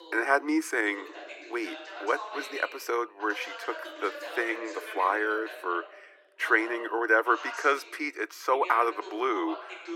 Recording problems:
thin; very; fading below 300 Hz
voice in the background; noticeable; throughout; 15 dB below the speech

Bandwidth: 16.5 kHz